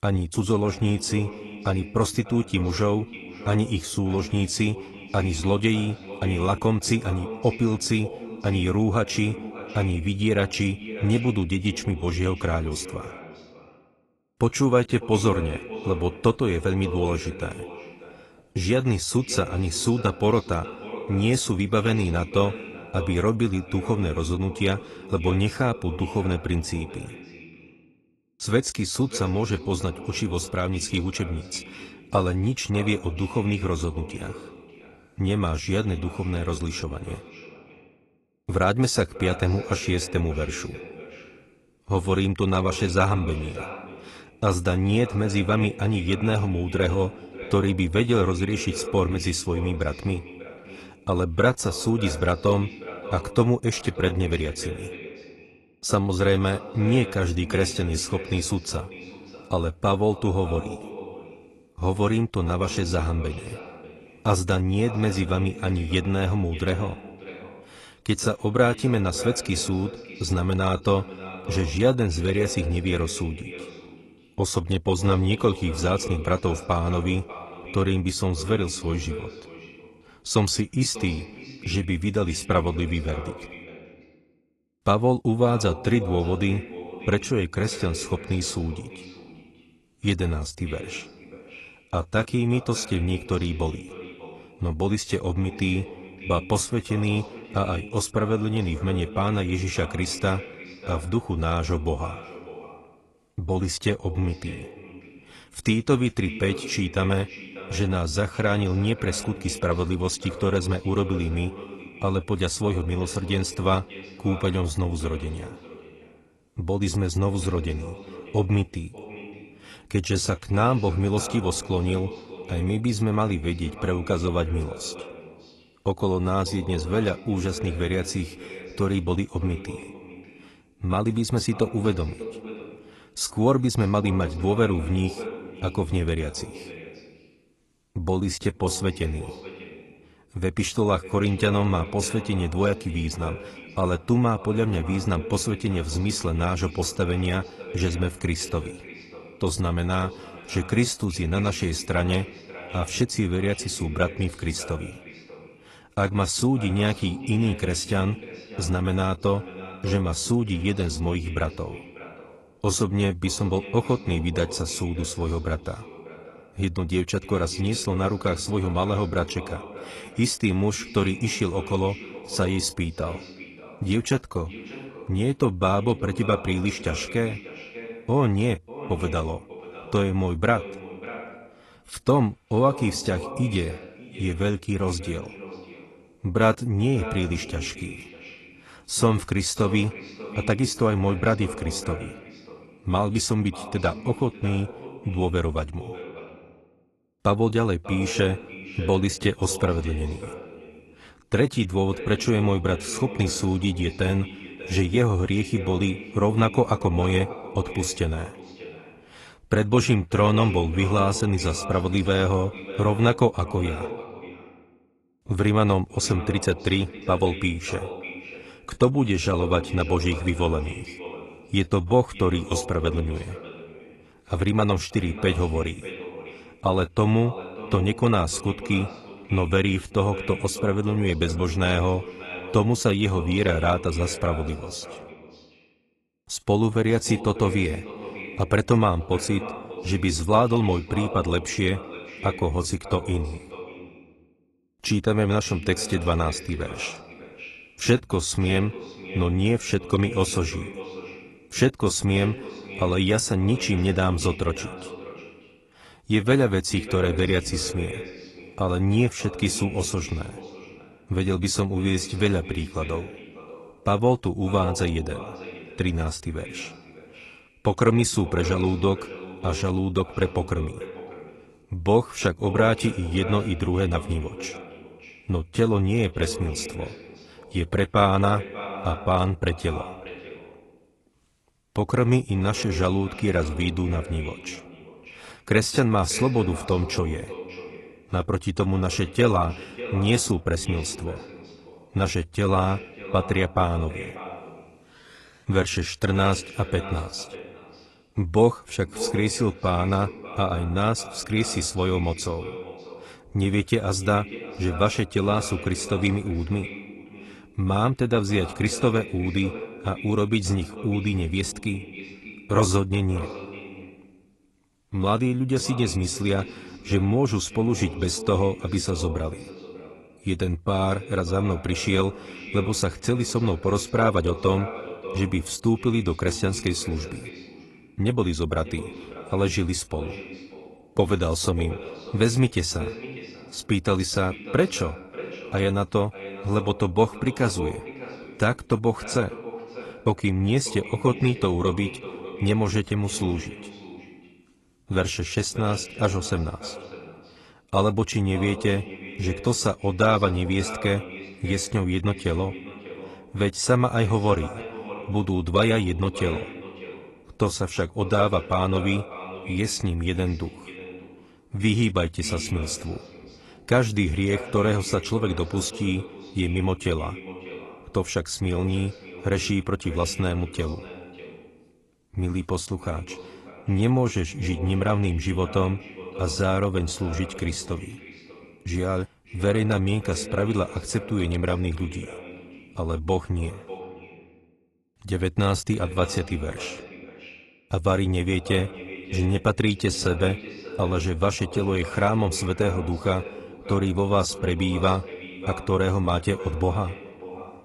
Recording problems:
echo of what is said; noticeable; throughout; 590 ms later, 15 dB below the speech
garbled, watery; slightly; nothing above 11 kHz

